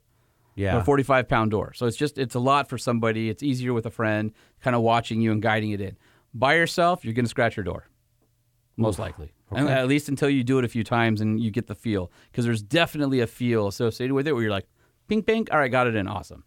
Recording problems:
none

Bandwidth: 18 kHz